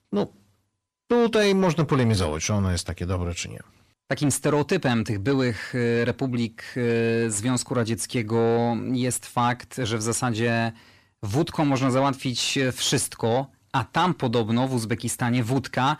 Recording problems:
distortion; slight; 10 dB below the speech

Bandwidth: 14.5 kHz